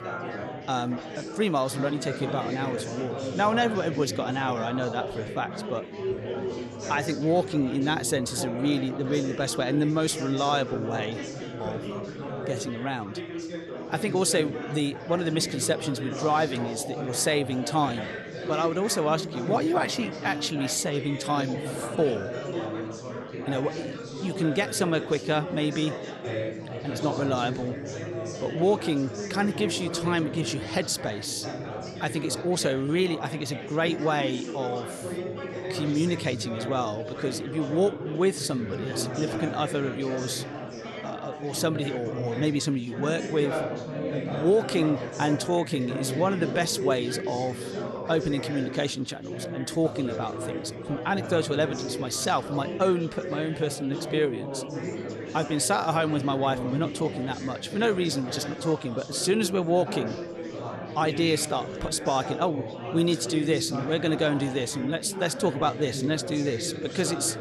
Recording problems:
chatter from many people; loud; throughout; 7 dB below the speech

